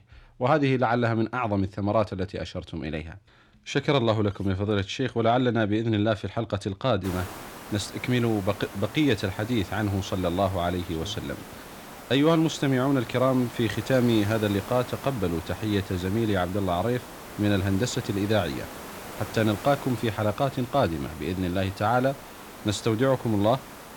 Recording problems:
hiss; noticeable; from 7 s on; 15 dB below the speech

